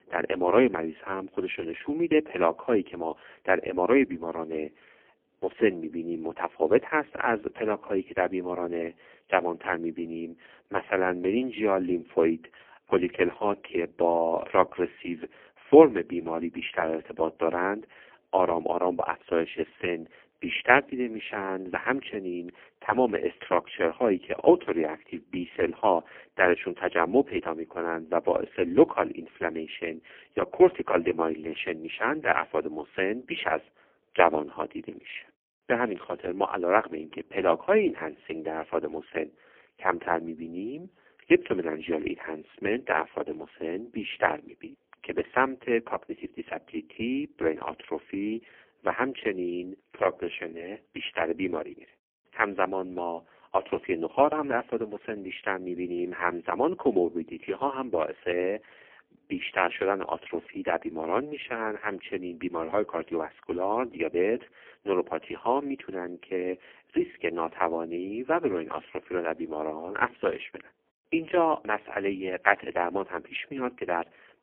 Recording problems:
phone-call audio; poor line; nothing above 3 kHz

